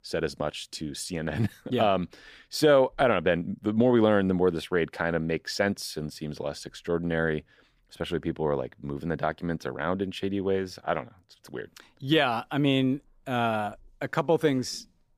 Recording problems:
none

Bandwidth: 15 kHz